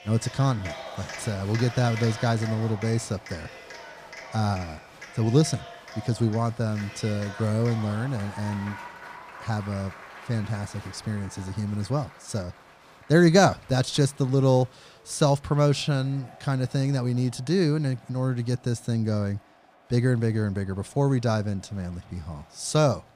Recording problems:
crowd noise; noticeable; throughout; 15 dB below the speech

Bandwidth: 15 kHz